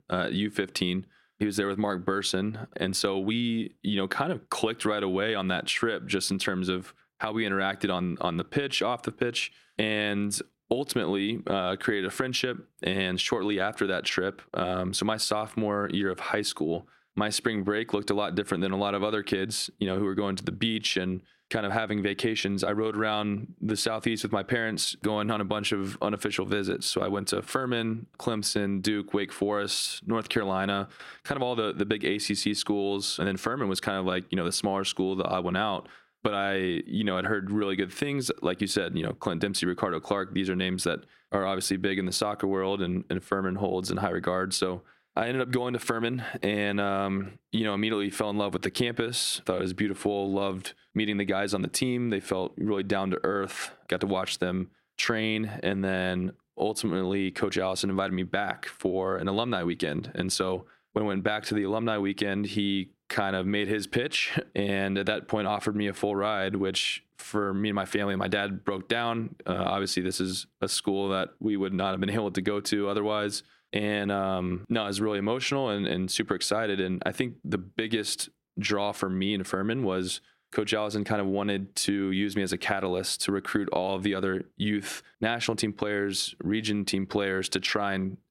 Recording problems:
squashed, flat; somewhat

